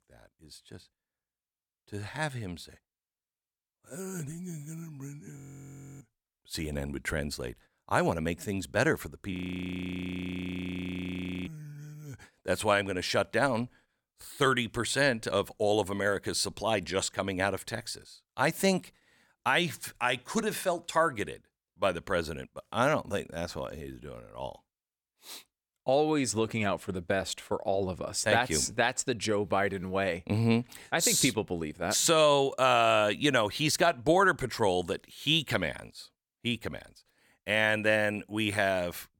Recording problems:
audio freezing; at 5.5 s for 0.5 s and at 9.5 s for 2 s

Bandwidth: 17.5 kHz